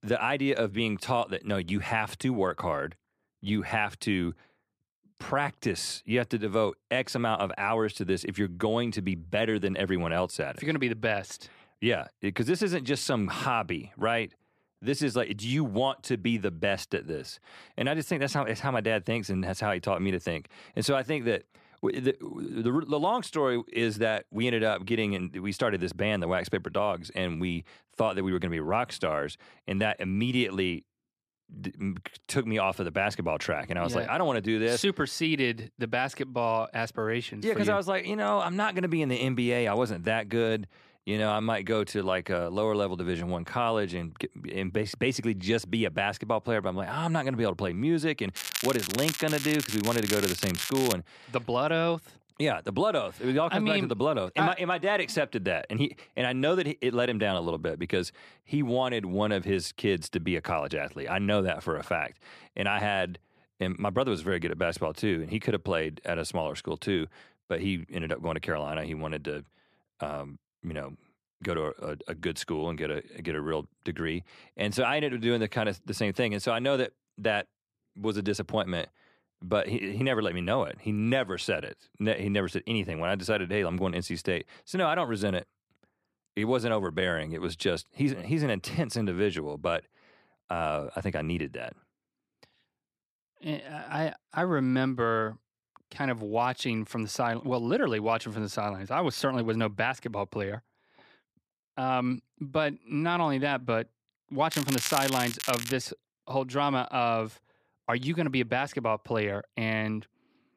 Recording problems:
crackling; loud; from 48 to 51 s and from 1:45 to 1:46; 3 dB below the speech

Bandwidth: 14.5 kHz